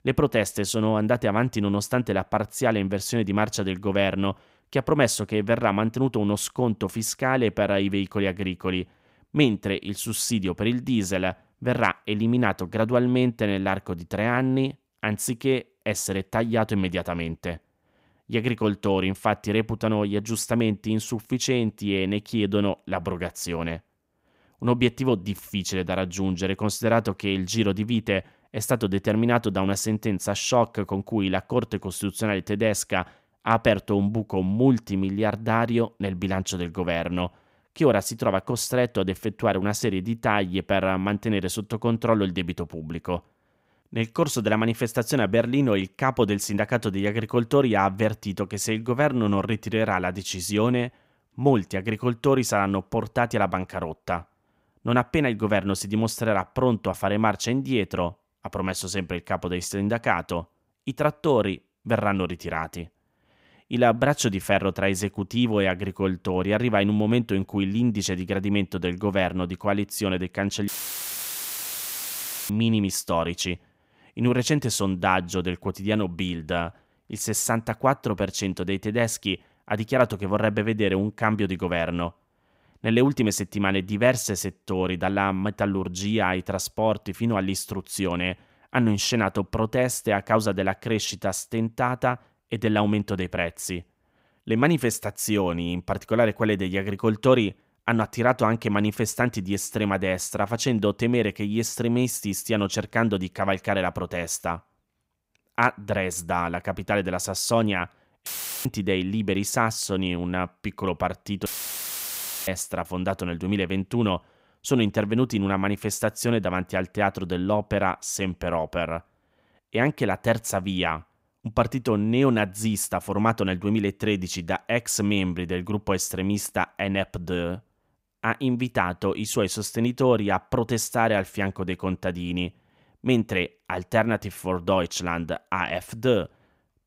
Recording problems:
audio cutting out; filled with static; at 1:11 for 2 s, at 1:48 and at 1:51 for 1 s

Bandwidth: 15.5 kHz